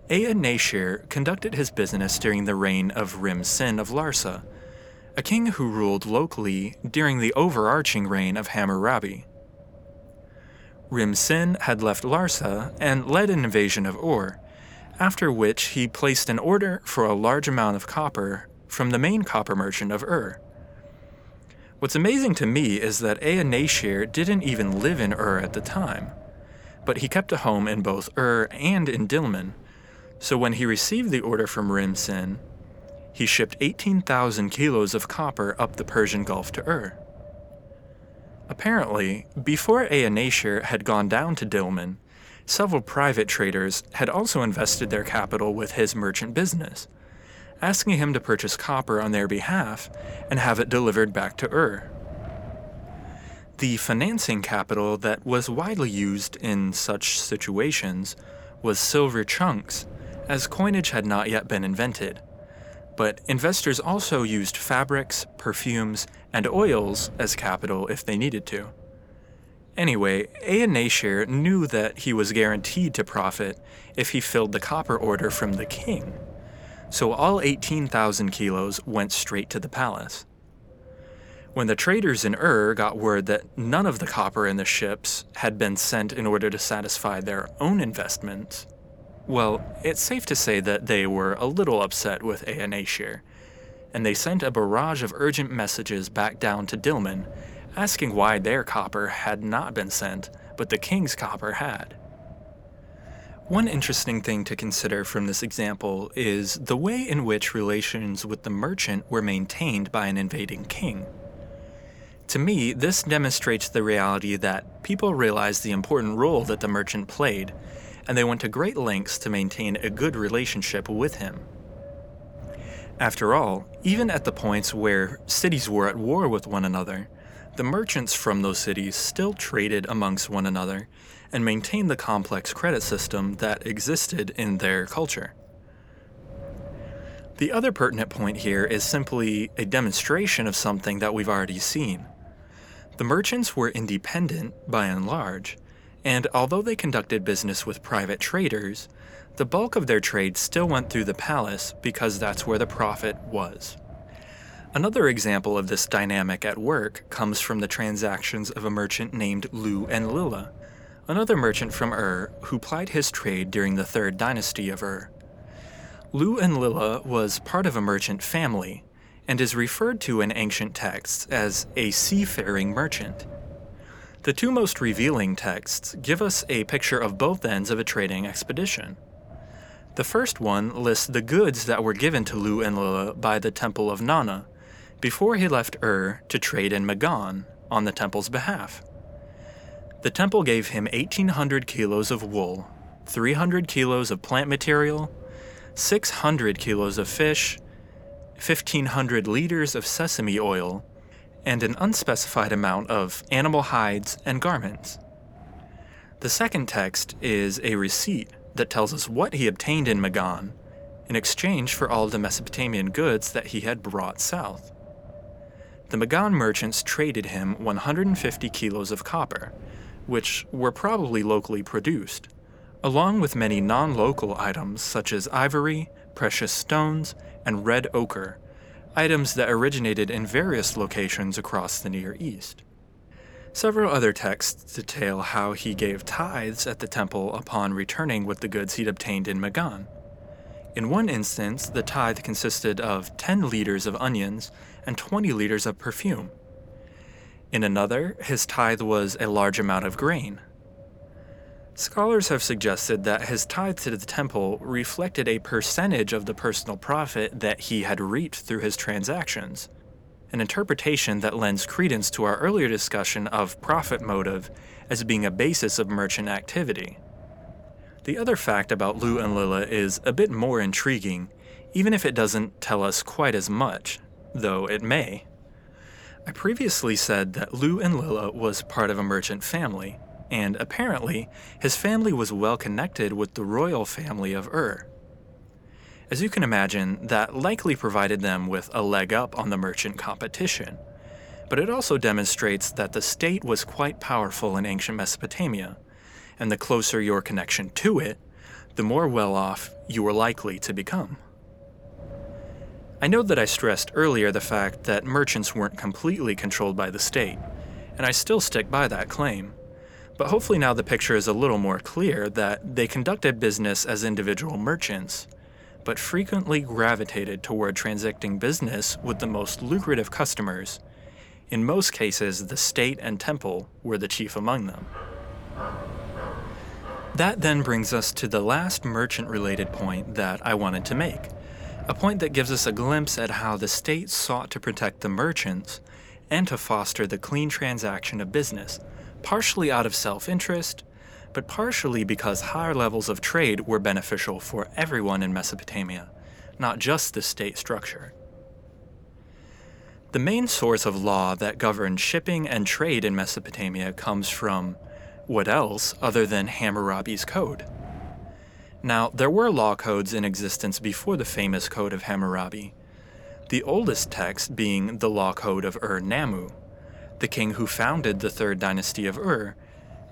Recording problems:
wind noise on the microphone; occasional gusts; 25 dB below the speech
dog barking; faint; from 5:25 to 5:27; peak 10 dB below the speech

